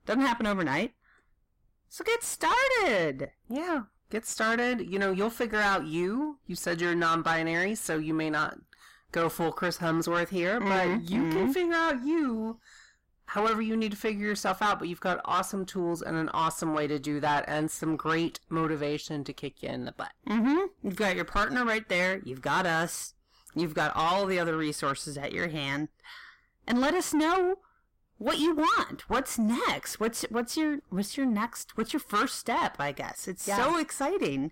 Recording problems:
distortion; heavy; 7 dB below the speech

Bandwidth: 16 kHz